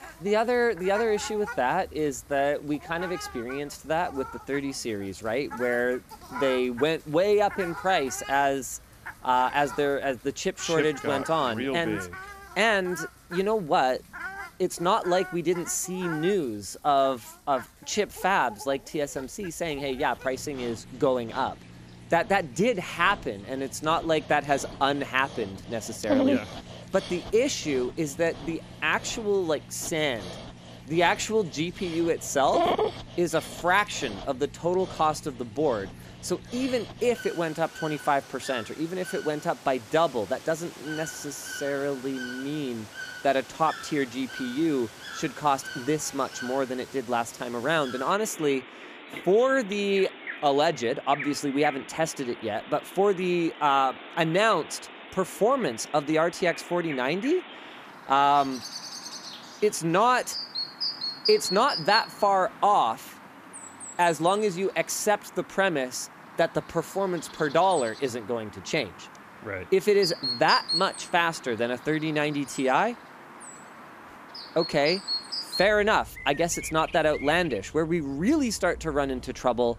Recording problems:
animal sounds; noticeable; throughout; 10 dB below the speech

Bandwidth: 14.5 kHz